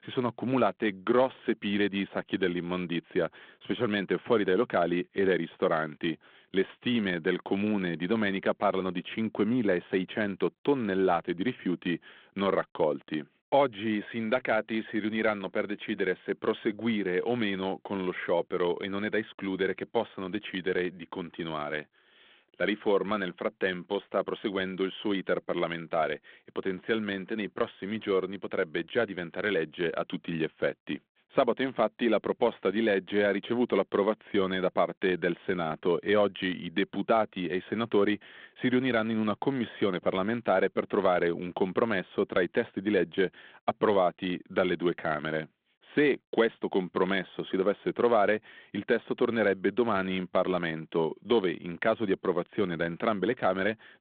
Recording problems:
phone-call audio

